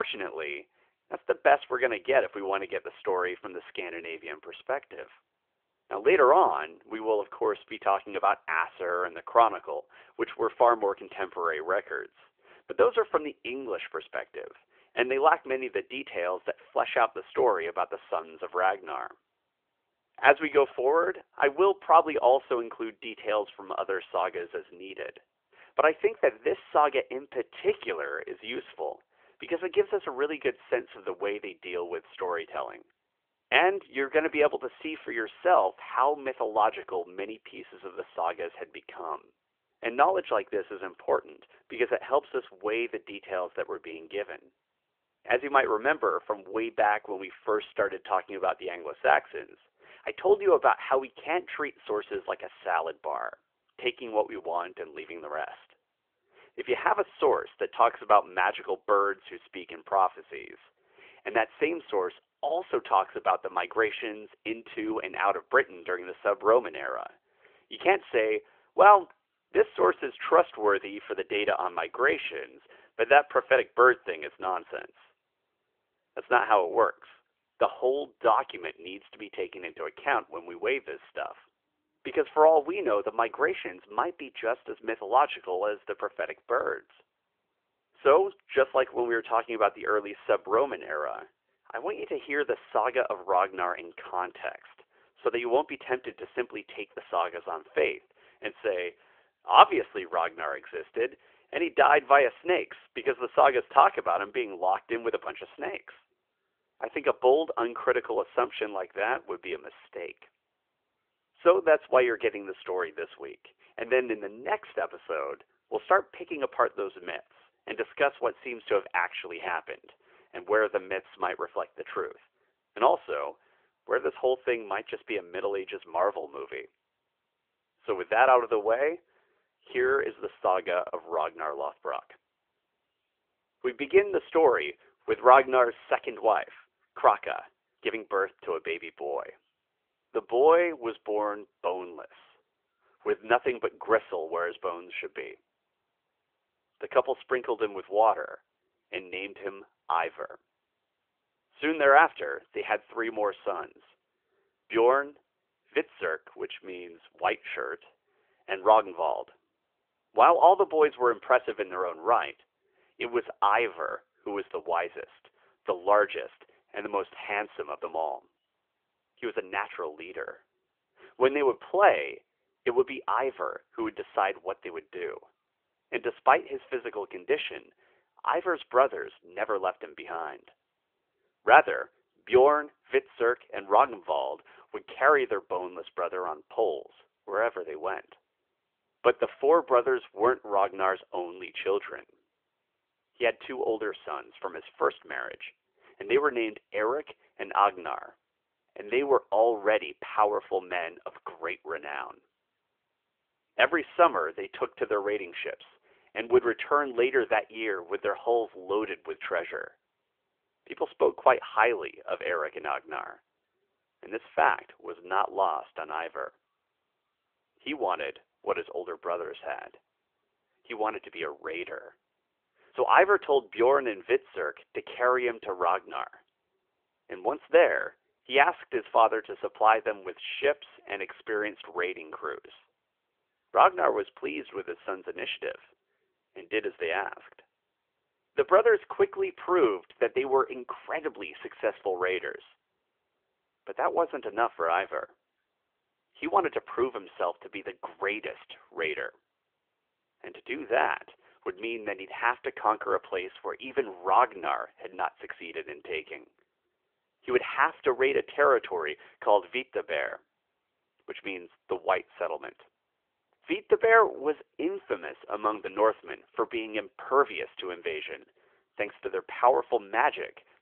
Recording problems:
phone-call audio; nothing above 3.5 kHz
abrupt cut into speech; at the start

